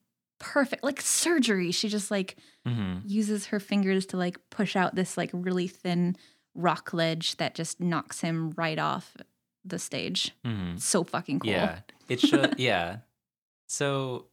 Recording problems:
none

